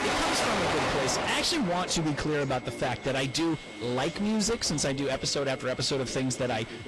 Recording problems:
distortion; heavy; 28% of the sound clipped
garbled, watery; slightly; nothing above 11.5 kHz
rain or running water; loud; throughout; as loud as the speech
background chatter; noticeable; throughout; 4 voices, 15 dB below the speech
high-pitched whine; faint; throughout; 2 kHz, 20 dB below the speech

